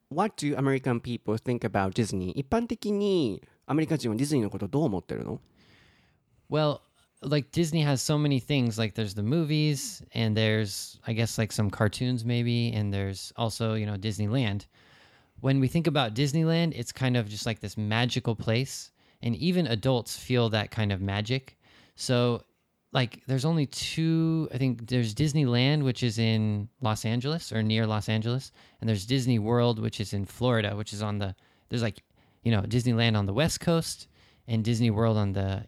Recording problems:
none

